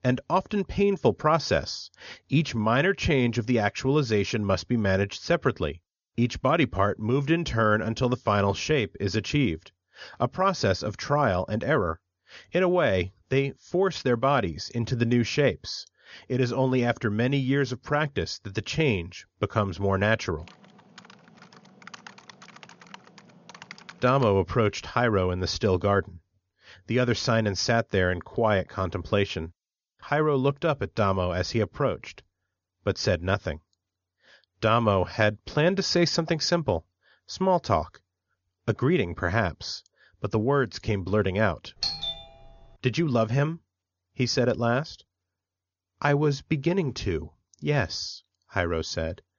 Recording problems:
high frequencies cut off; noticeable; nothing above 7 kHz
keyboard typing; faint; from 20 to 24 s; peak 20 dB below the speech
doorbell; noticeable; at 42 s; peak 2 dB below the speech

